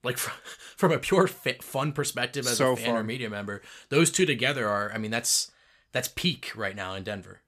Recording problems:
none

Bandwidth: 14.5 kHz